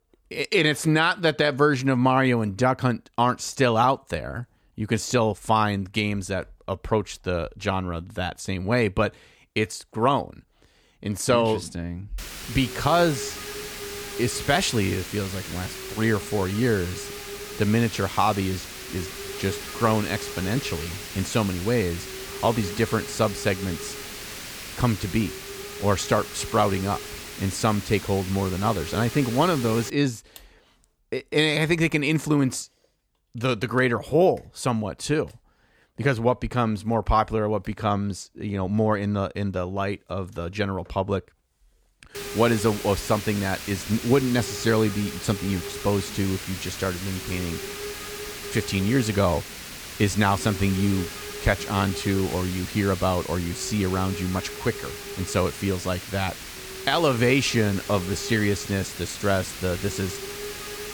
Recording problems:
hiss; loud; from 12 to 30 s and from 42 s on; 10 dB below the speech

